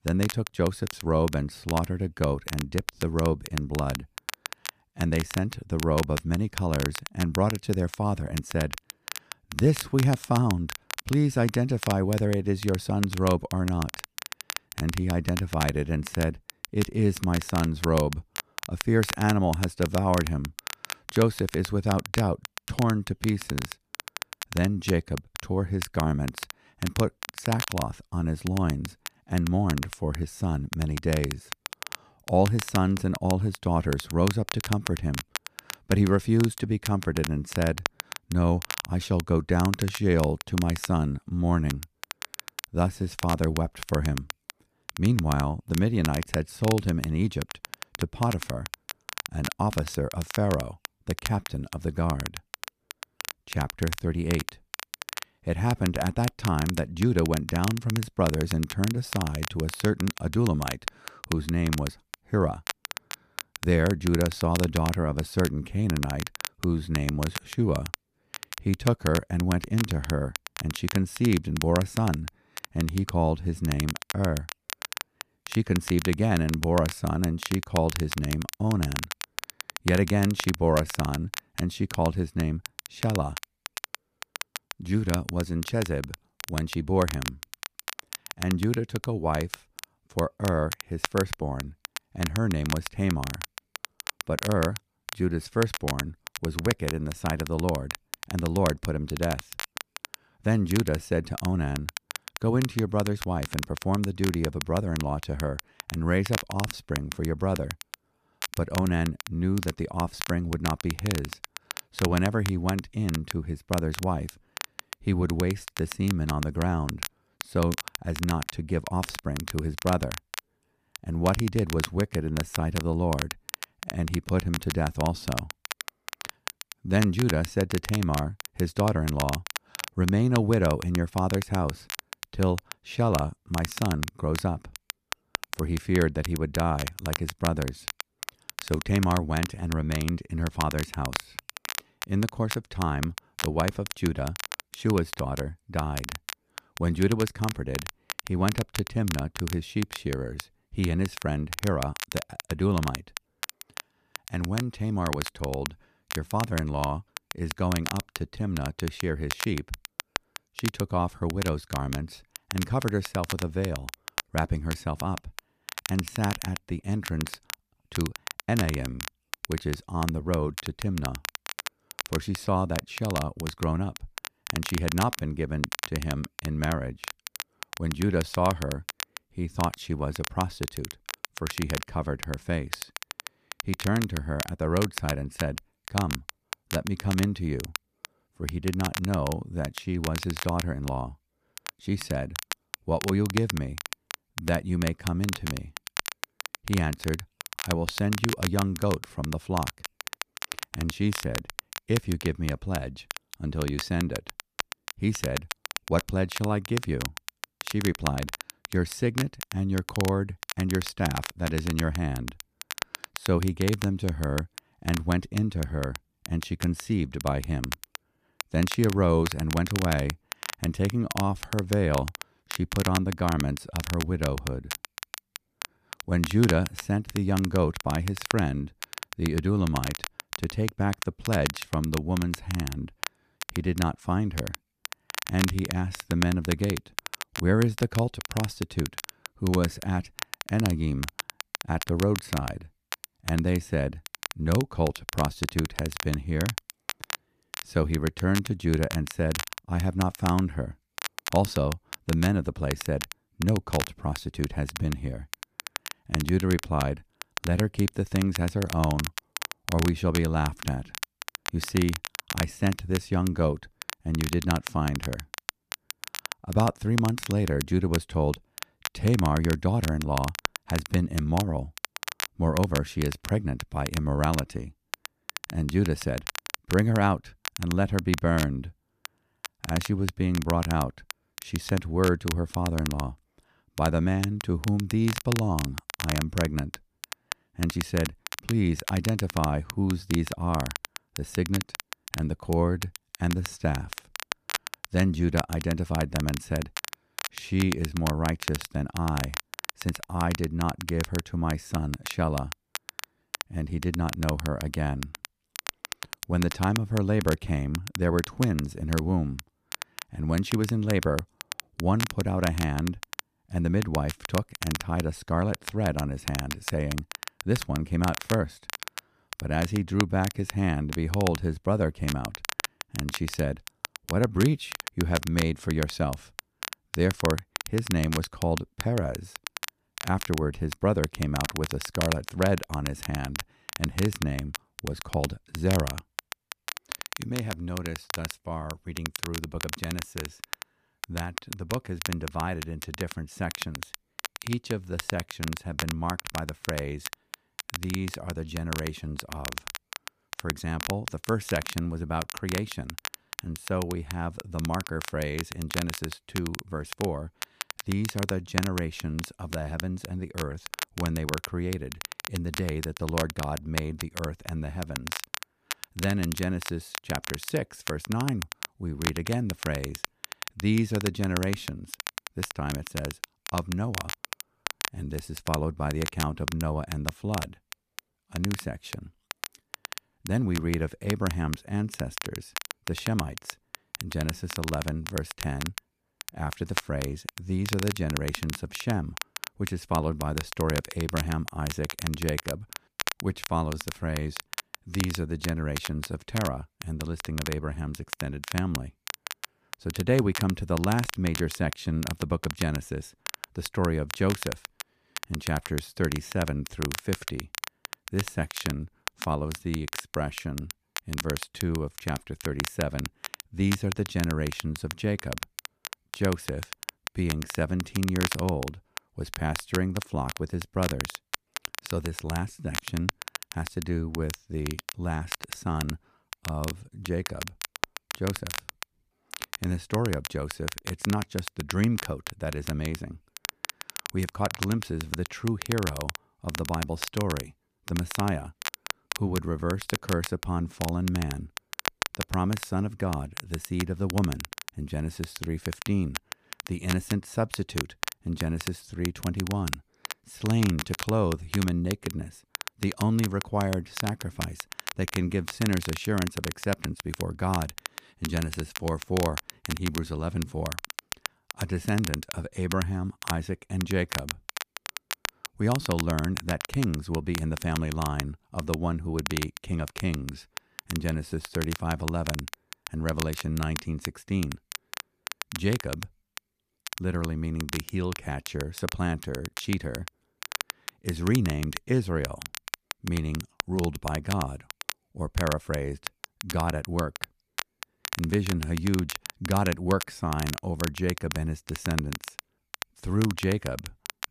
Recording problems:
crackle, like an old record; loud; 8 dB below the speech

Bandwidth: 14.5 kHz